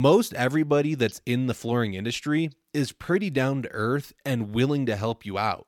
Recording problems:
abrupt cut into speech; at the start

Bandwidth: 17 kHz